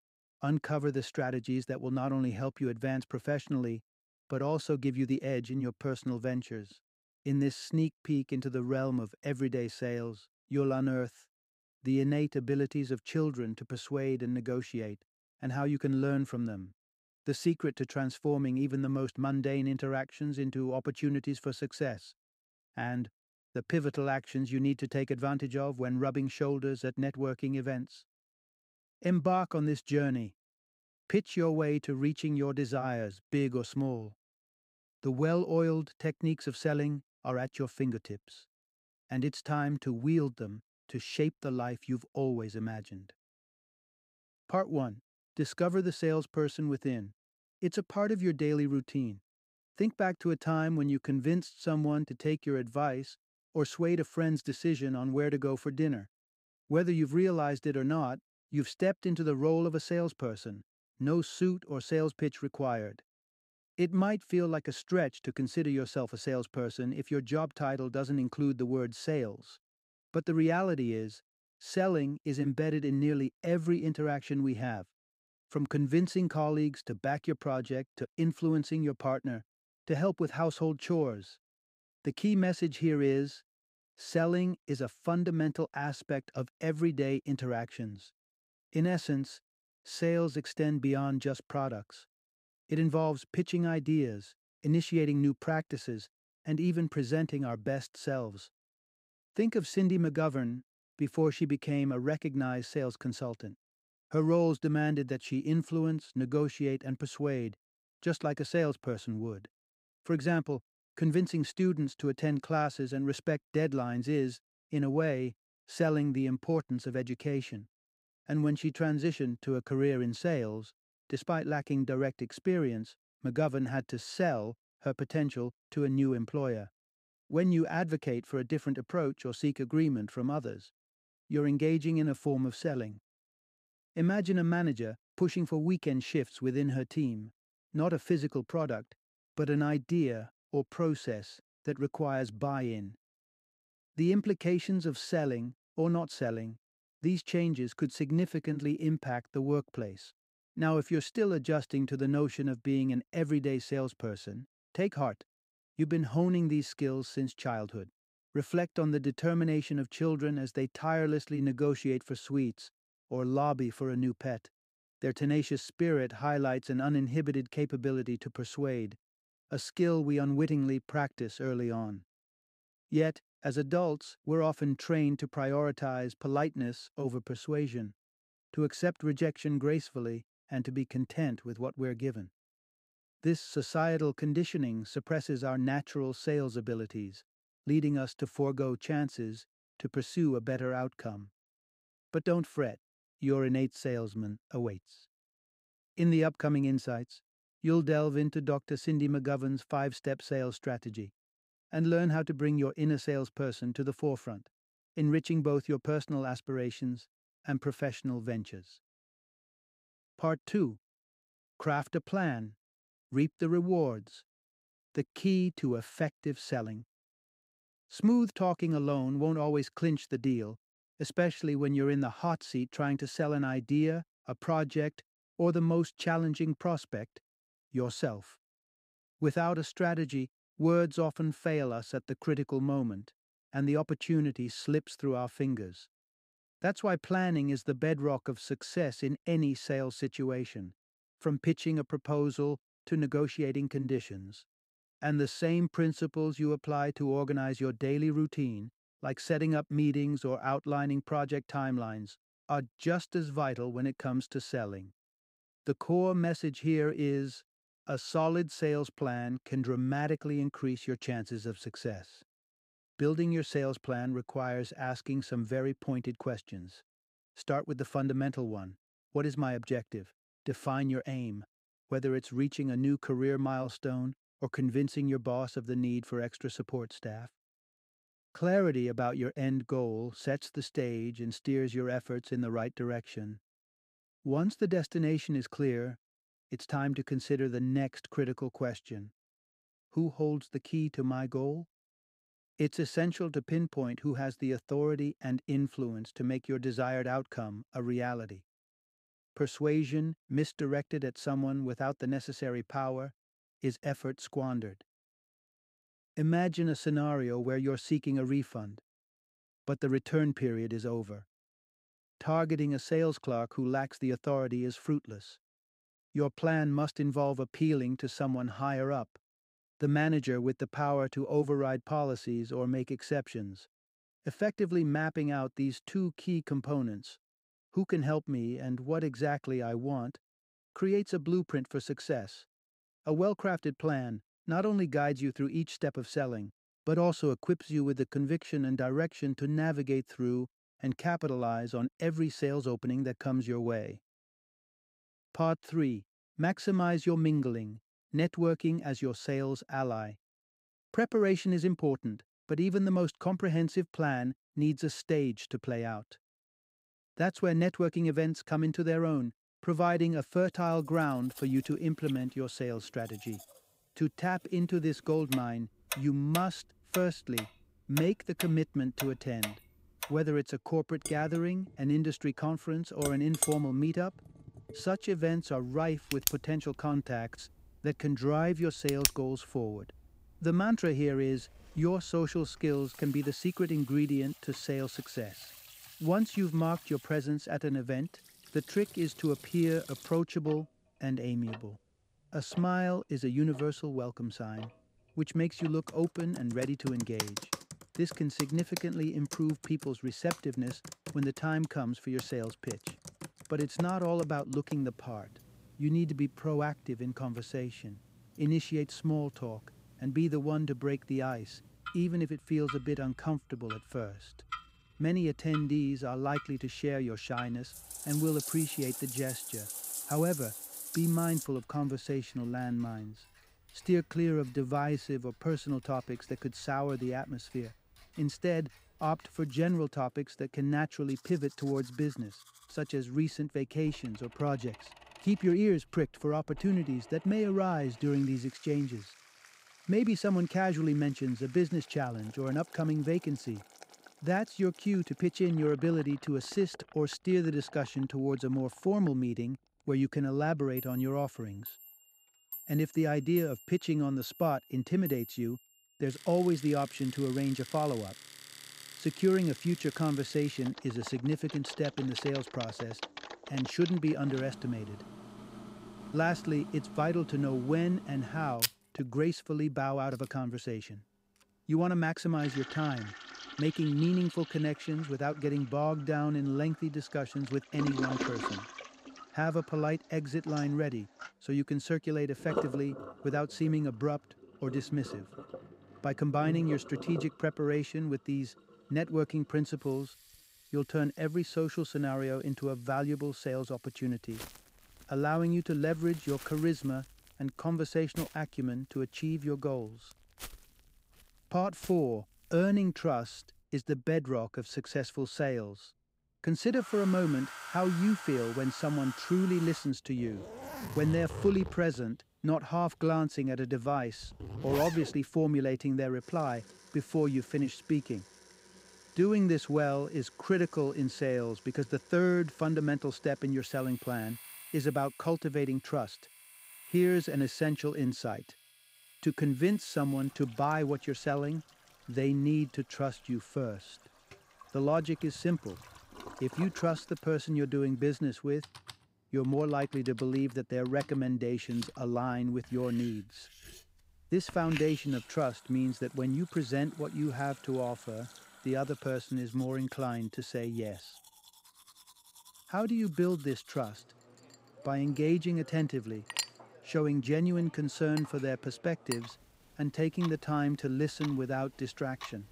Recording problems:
household noises; noticeable; from 6:01 on; 10 dB below the speech

